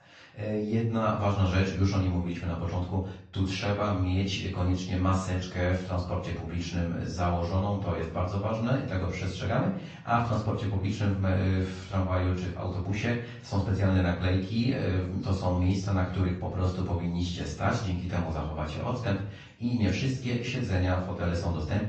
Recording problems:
off-mic speech; far
room echo; slight; dies away in 0.5 s
garbled, watery; slightly
high frequencies cut off; slight; nothing above 8 kHz

